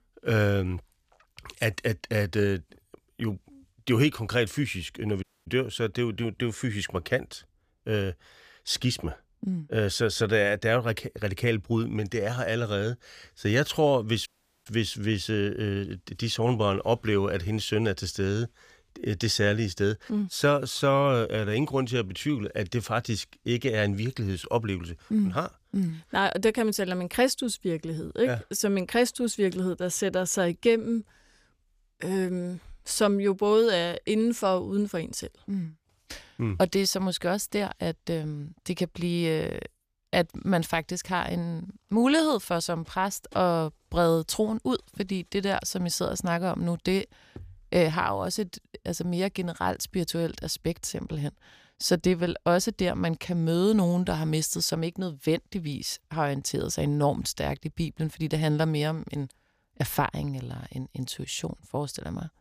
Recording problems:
audio cutting out; at 5 s and at 14 s

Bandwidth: 15 kHz